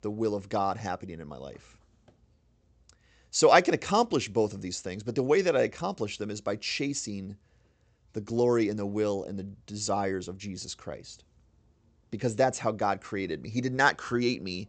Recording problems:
high frequencies cut off; noticeable; nothing above 8 kHz

